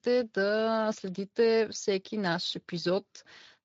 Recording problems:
garbled, watery; slightly; nothing above 7 kHz

